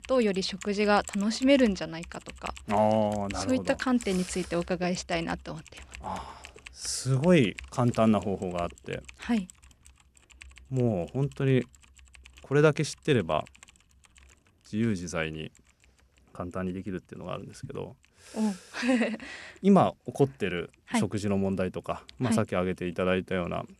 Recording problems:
household noises; noticeable; throughout; 20 dB below the speech

